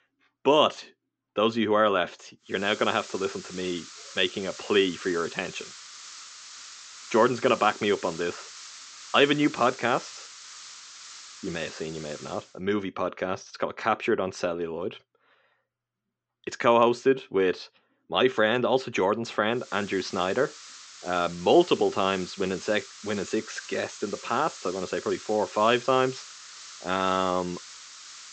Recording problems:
high frequencies cut off; noticeable; nothing above 8 kHz
hiss; noticeable; from 2.5 to 12 s and from 20 s on; 15 dB below the speech

